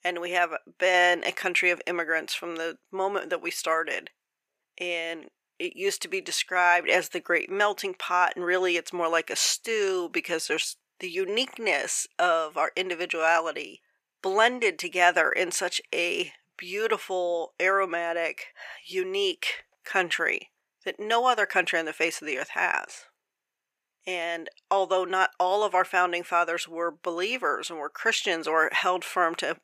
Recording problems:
thin; very; fading below 600 Hz

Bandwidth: 15 kHz